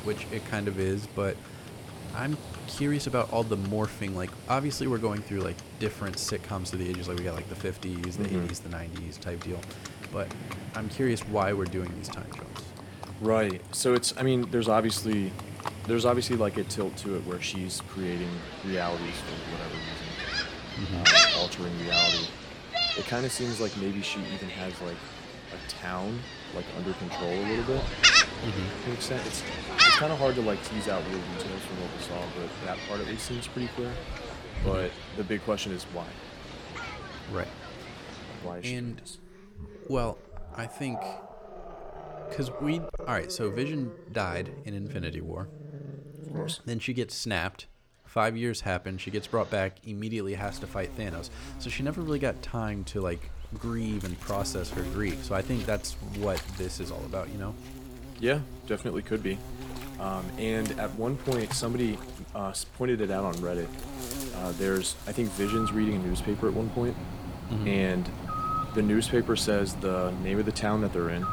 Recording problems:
animal sounds; loud; throughout; as loud as the speech

